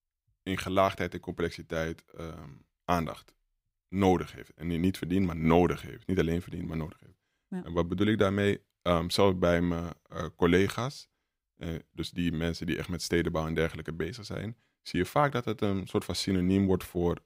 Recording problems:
none

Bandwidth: 15.5 kHz